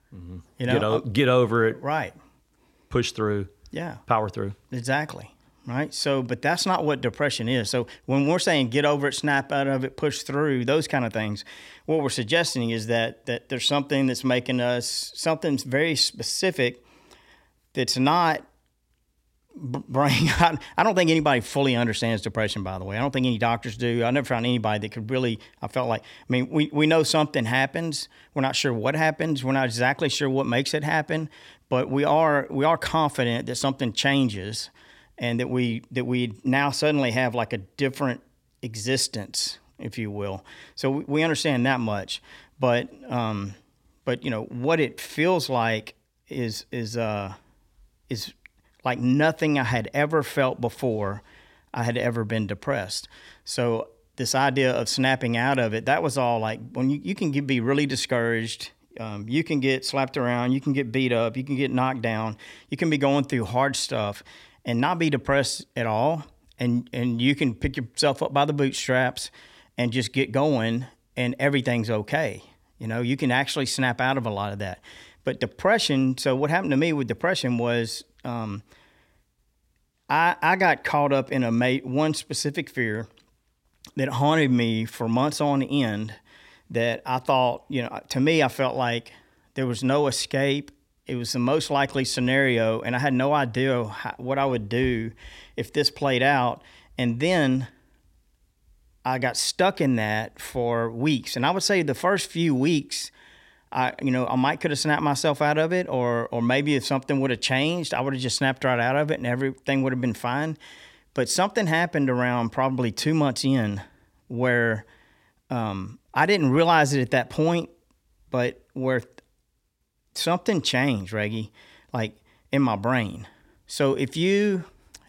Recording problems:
none

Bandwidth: 16.5 kHz